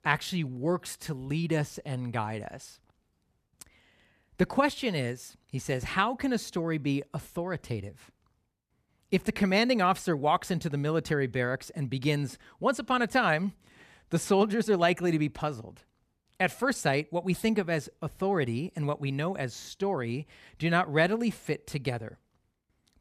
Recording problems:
none

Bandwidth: 14.5 kHz